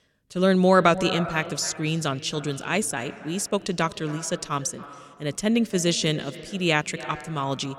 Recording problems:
echo of what is said; noticeable; throughout; 270 ms later, 15 dB below the speech

